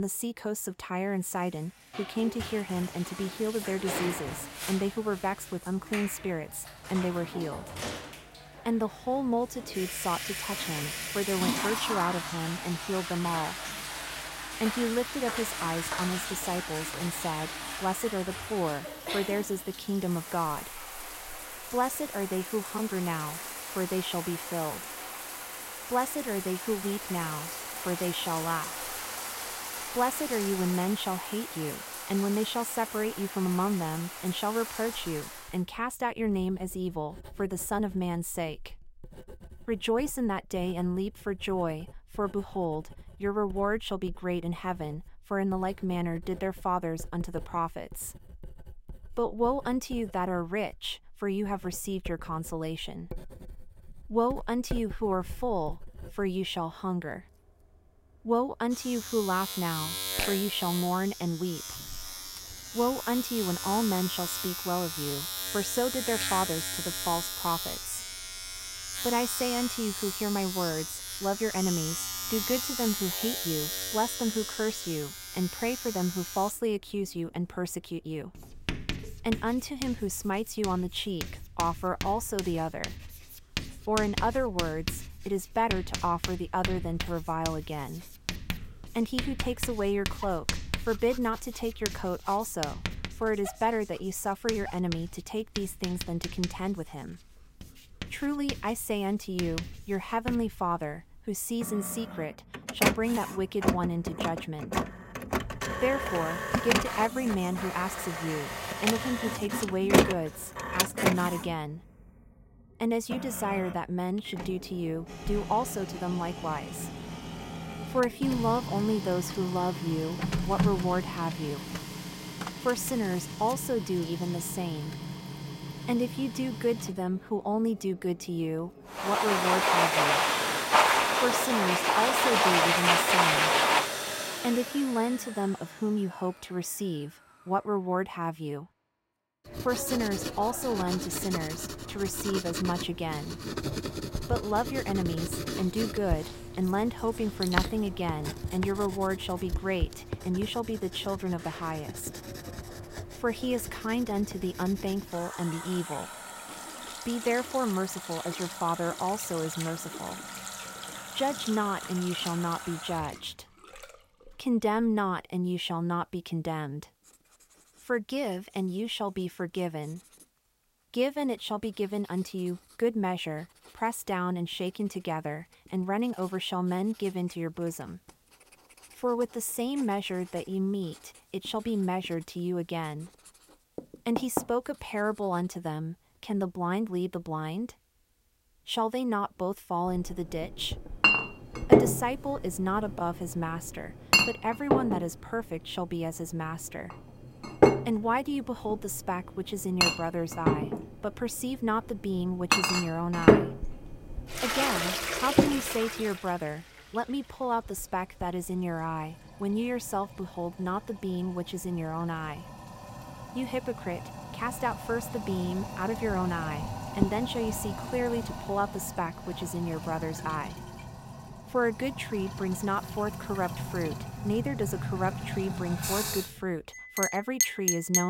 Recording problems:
household noises; loud; throughout; 1 dB below the speech
abrupt cut into speech; at the start and the end

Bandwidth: 16 kHz